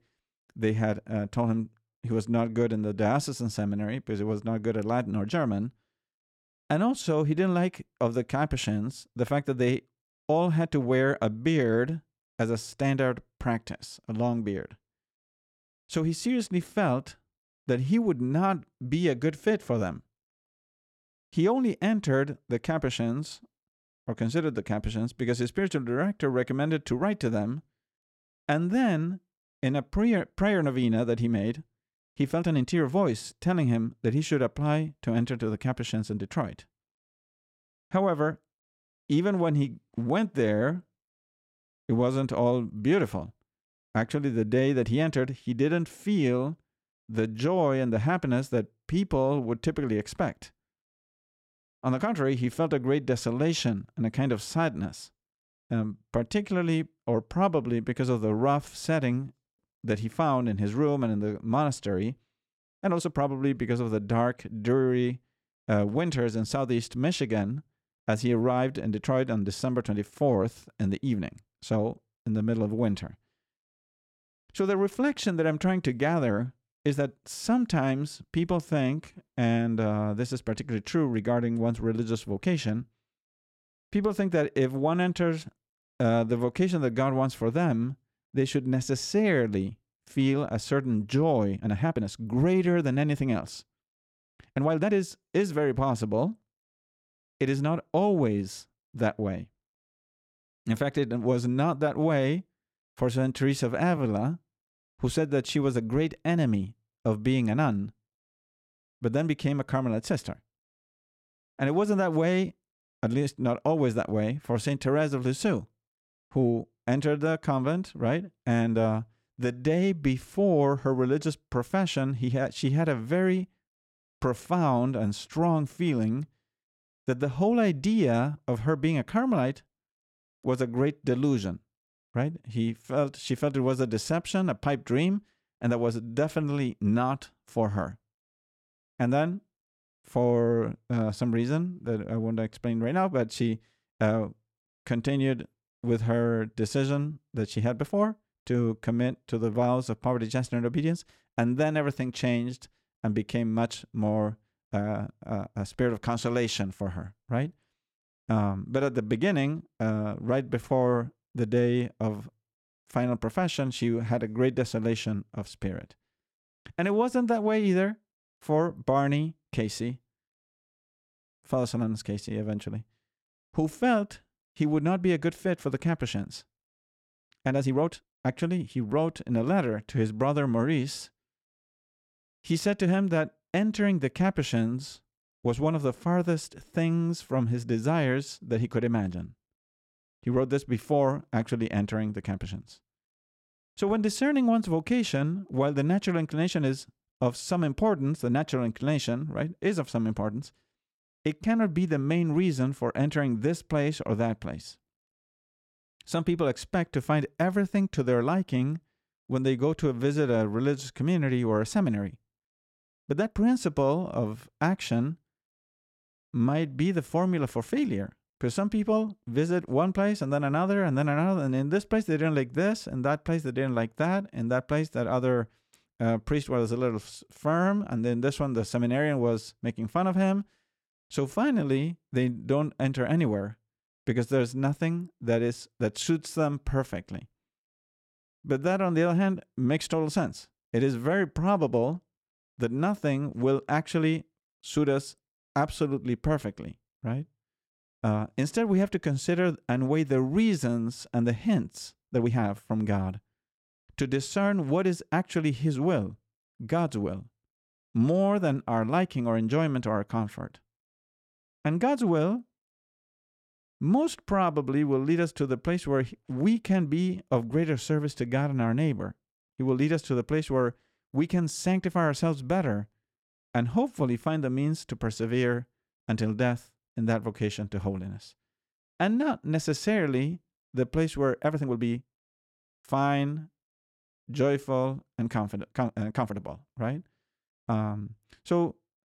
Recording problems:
uneven, jittery; strongly; from 32 s to 4:46

